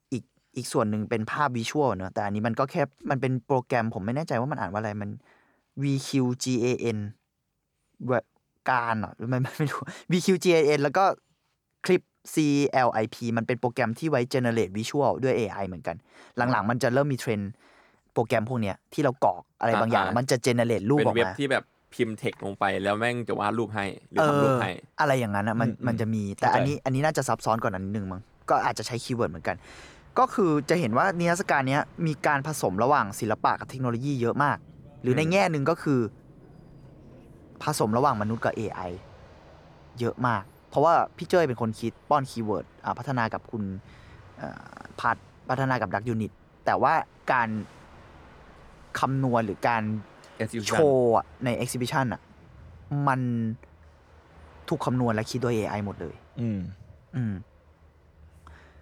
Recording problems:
train or aircraft noise; faint; from 22 s on; 25 dB below the speech

